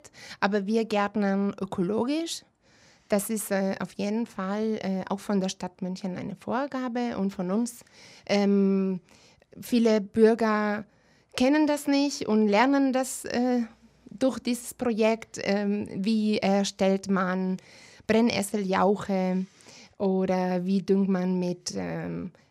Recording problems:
none

